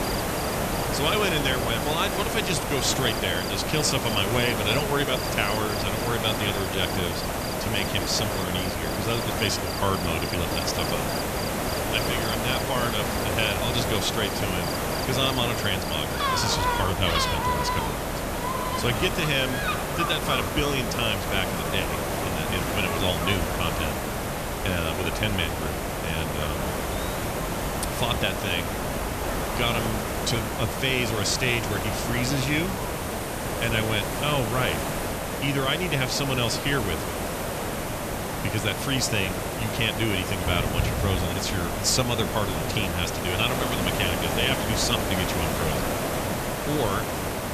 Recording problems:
animal sounds; loud; throughout; 9 dB below the speech
hiss; loud; throughout; 1 dB below the speech

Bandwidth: 14.5 kHz